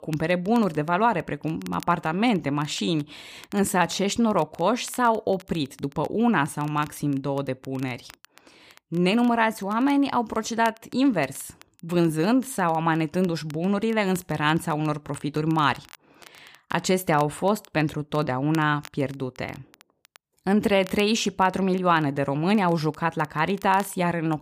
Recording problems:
crackle, like an old record; faint; 25 dB below the speech

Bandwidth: 15 kHz